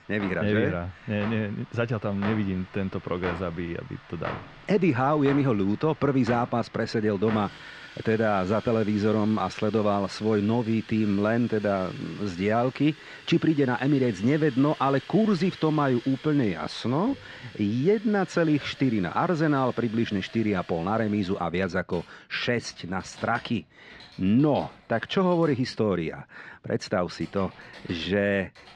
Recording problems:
muffled; slightly; fading above 4 kHz
household noises; noticeable; throughout; 20 dB below the speech

